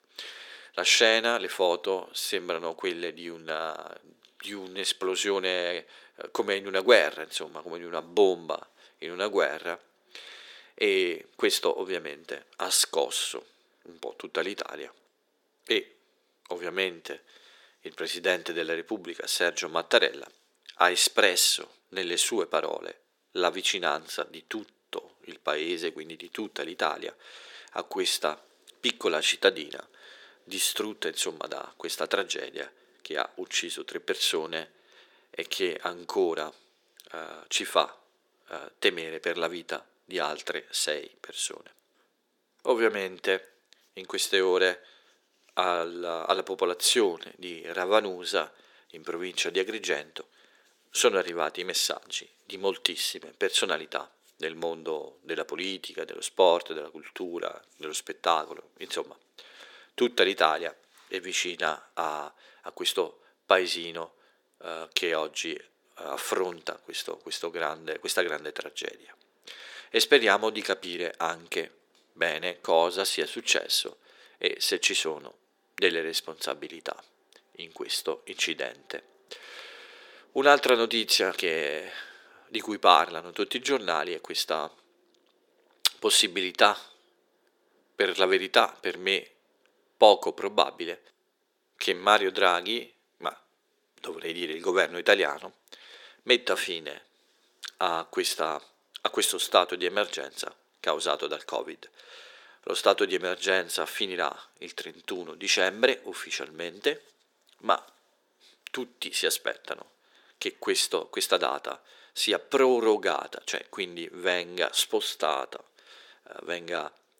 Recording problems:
thin; very; fading below 350 Hz

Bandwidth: 17 kHz